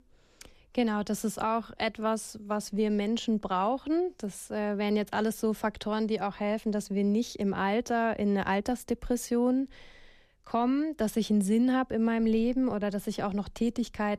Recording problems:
none

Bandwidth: 14.5 kHz